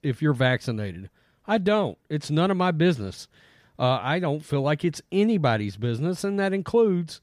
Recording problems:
none

